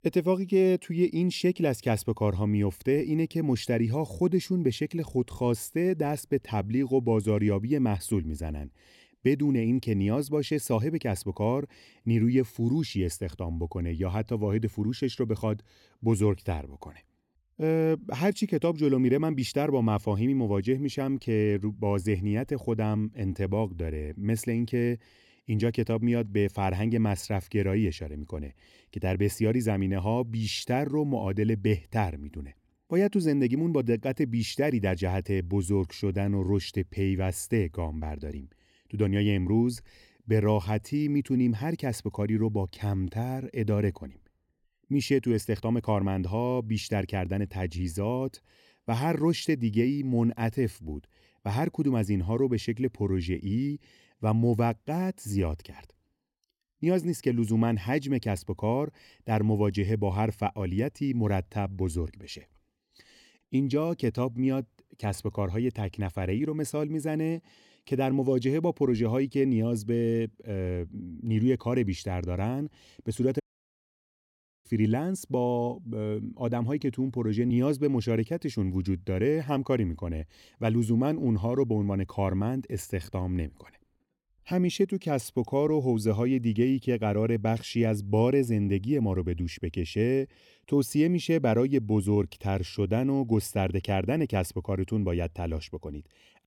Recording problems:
audio cutting out; at 1:13 for 1.5 s

